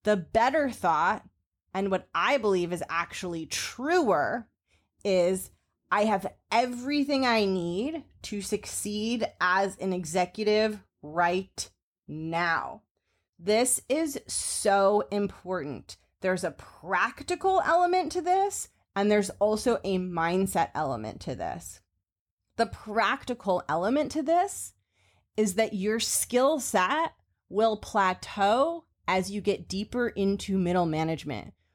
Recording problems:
none

